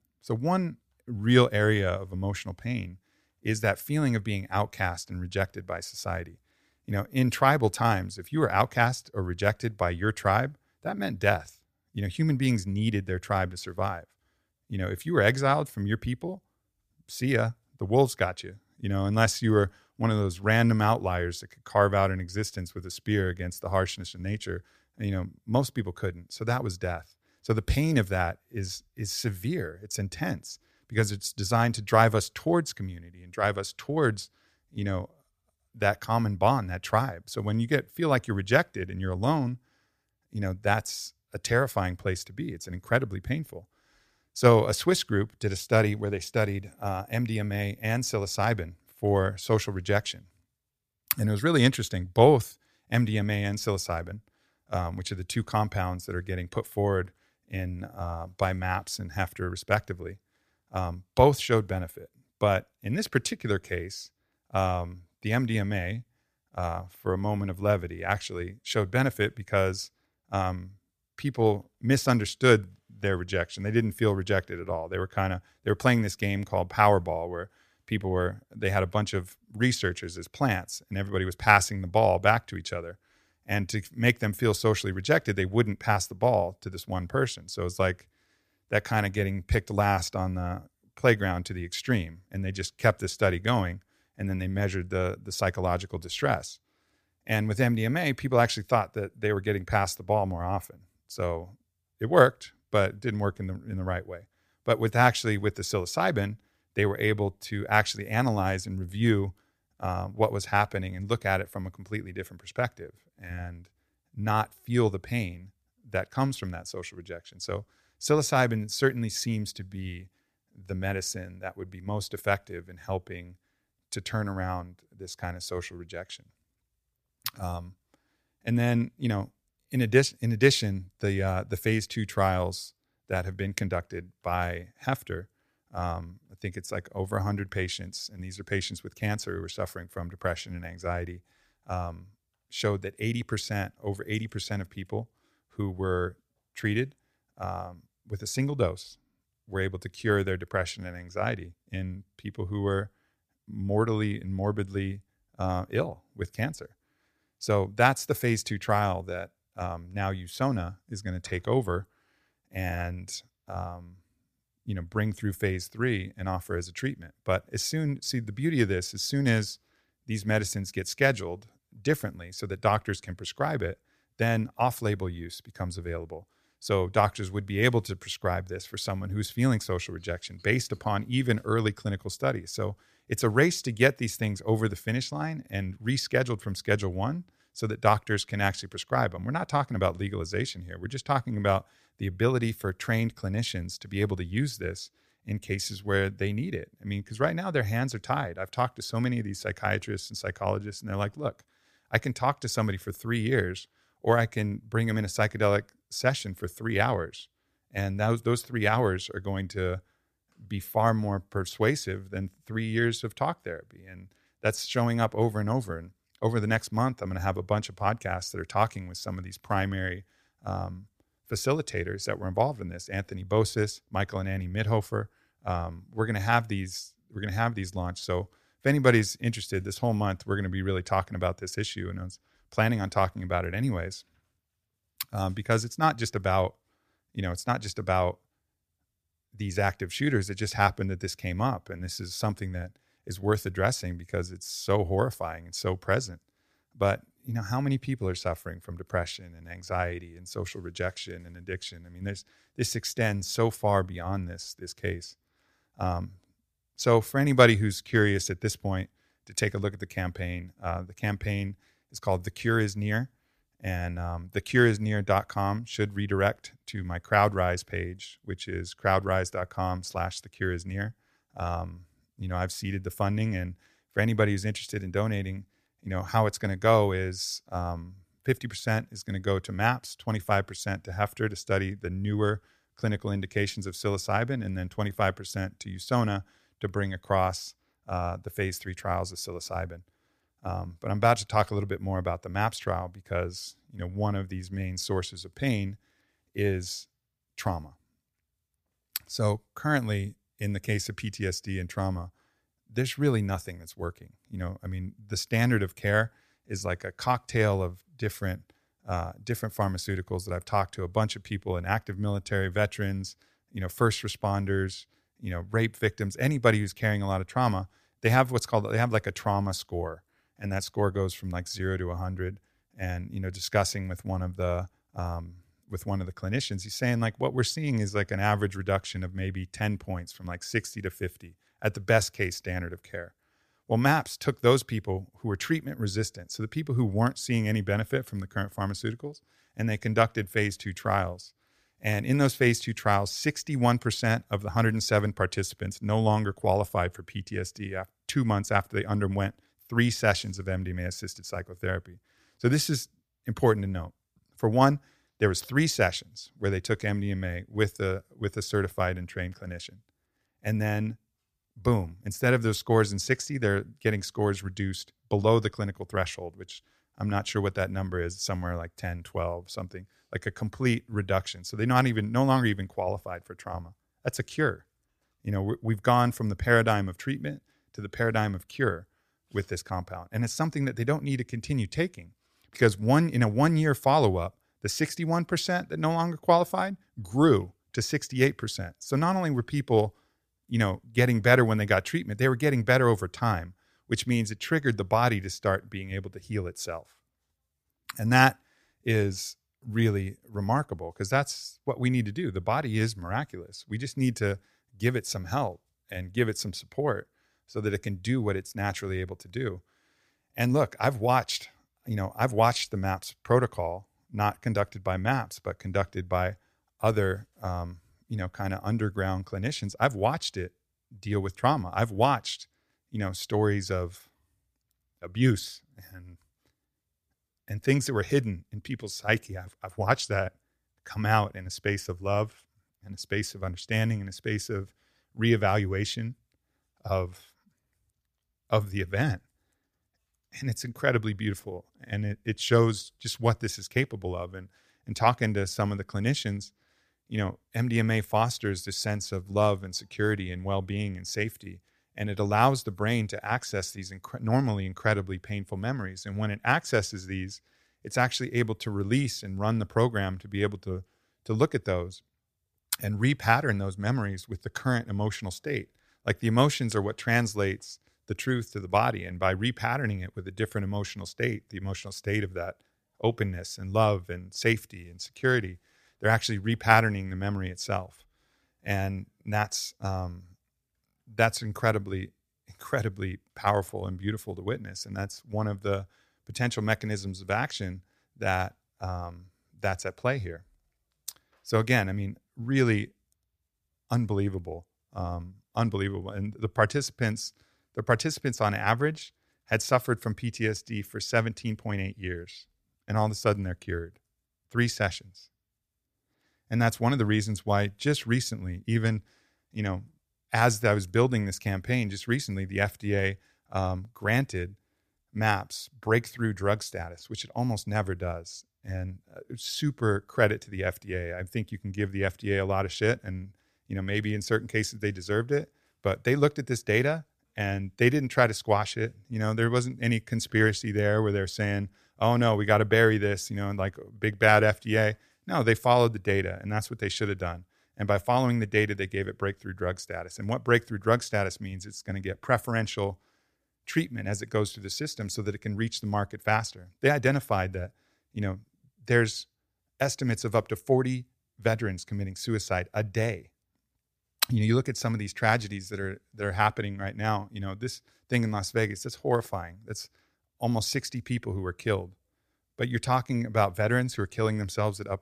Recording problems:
none

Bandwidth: 15 kHz